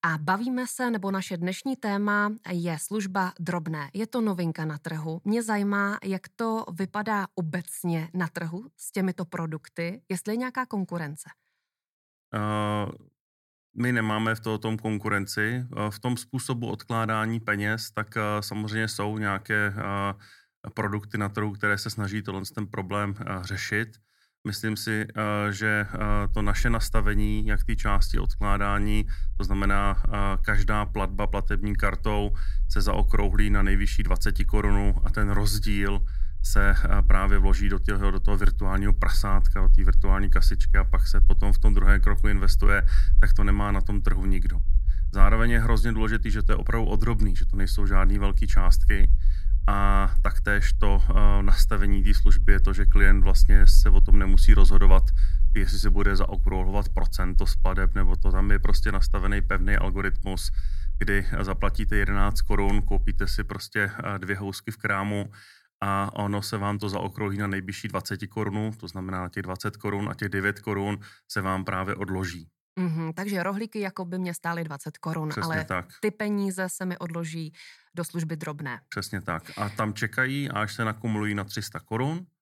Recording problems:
low rumble; faint; from 26 s to 1:03; 25 dB below the speech

